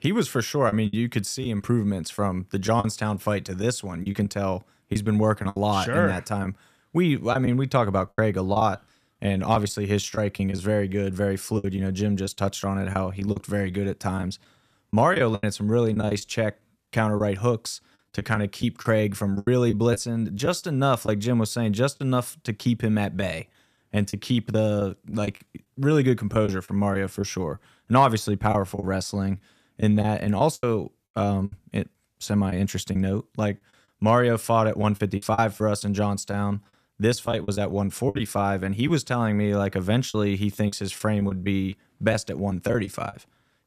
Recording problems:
choppy; very; 7% of the speech affected

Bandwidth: 14.5 kHz